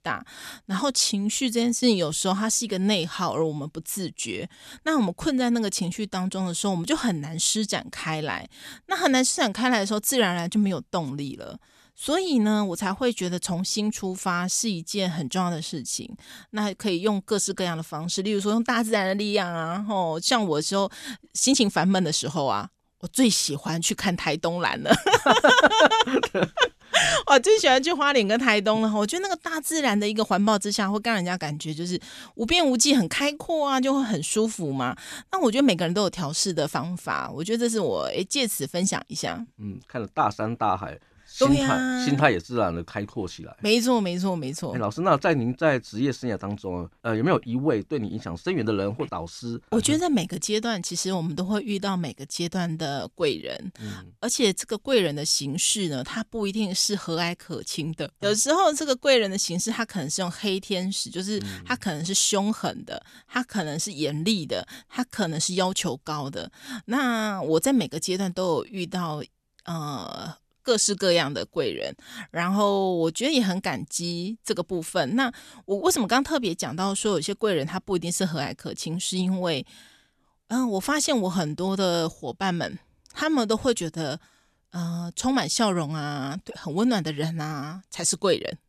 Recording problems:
none

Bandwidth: 13.5 kHz